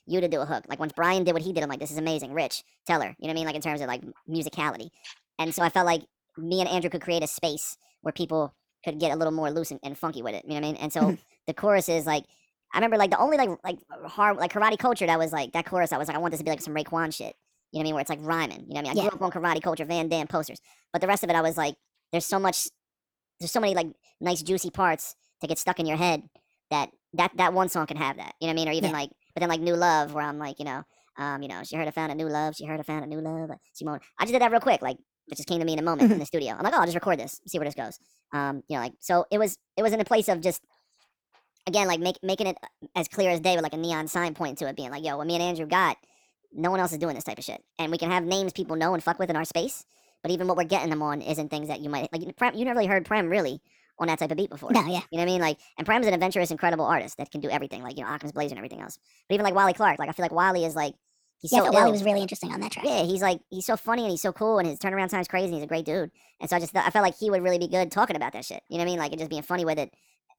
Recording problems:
wrong speed and pitch; too fast and too high; 1.5 times normal speed

